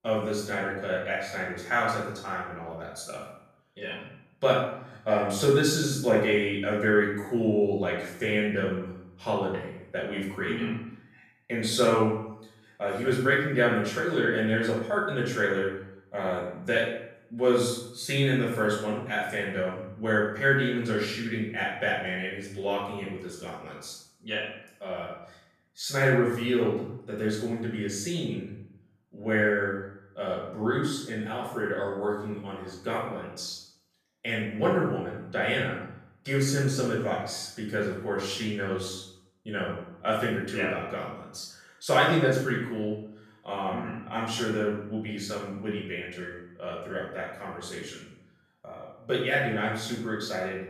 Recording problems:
off-mic speech; far
room echo; noticeable; dies away in 0.6 s

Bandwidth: 14.5 kHz